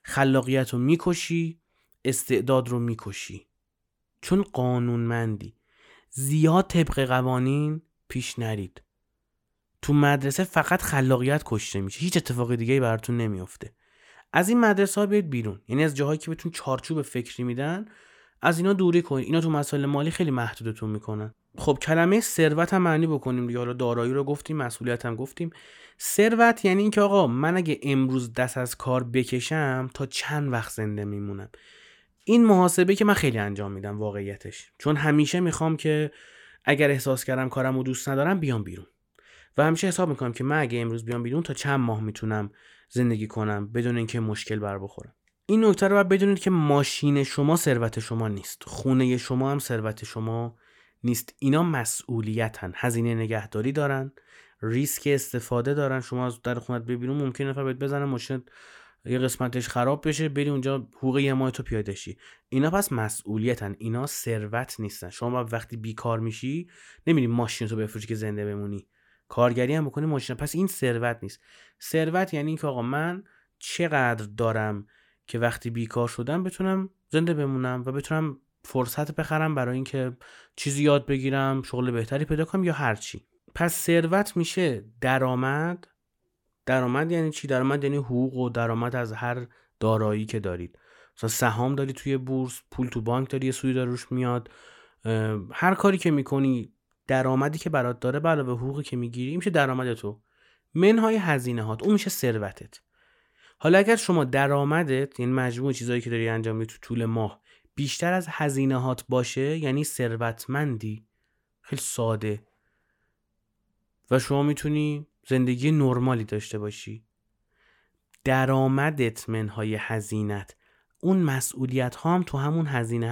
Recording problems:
abrupt cut into speech; at the end

